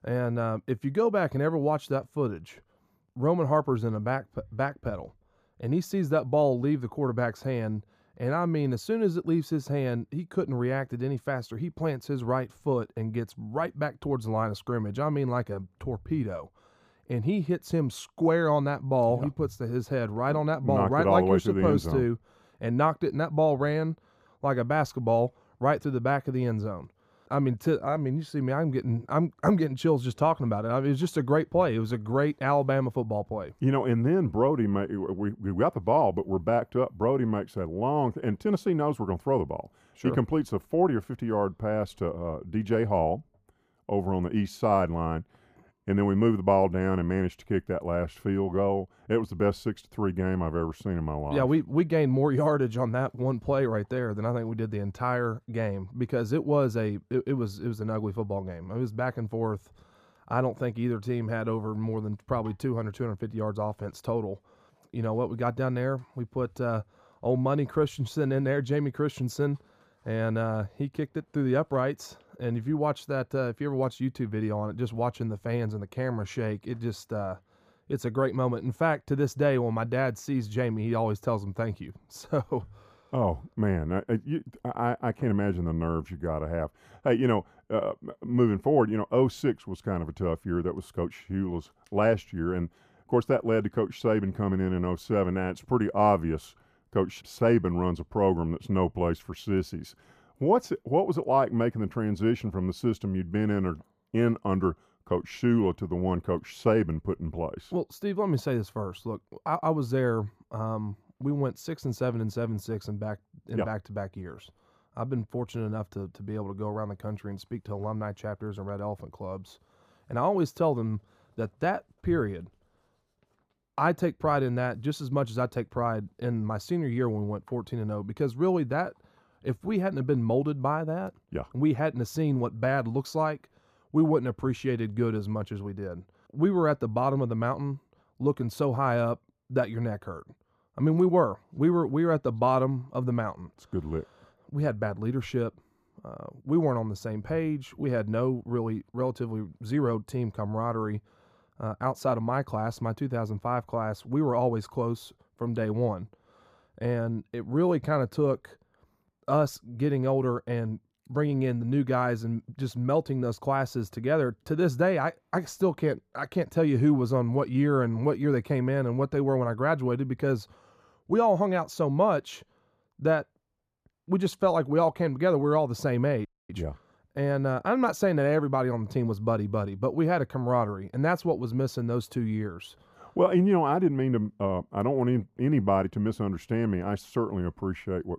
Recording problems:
muffled; slightly; fading above 1.5 kHz
audio freezing; at 2:56

